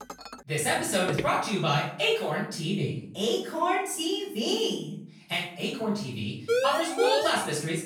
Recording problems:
off-mic speech; far
room echo; noticeable; dies away in 0.5 s
clattering dishes; faint; at the start; peak 15 dB below the speech
footsteps; noticeable; at 1 s; peak 6 dB below the speech
siren; loud; at 6.5 s; peak 2 dB above the speech

